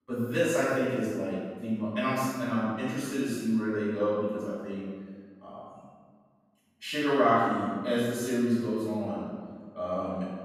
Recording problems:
room echo; strong; dies away in 1.5 s
off-mic speech; far

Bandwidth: 15.5 kHz